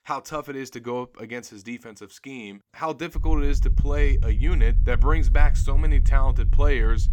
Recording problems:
low rumble; noticeable; from 3 s on; 15 dB below the speech

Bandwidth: 18 kHz